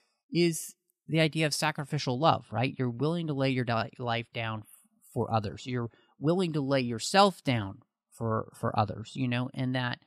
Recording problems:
none

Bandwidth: 14.5 kHz